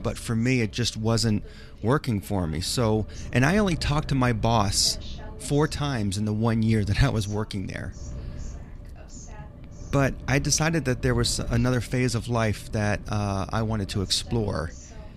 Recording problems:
wind noise on the microphone; occasional gusts; 25 dB below the speech
voice in the background; faint; throughout; 25 dB below the speech

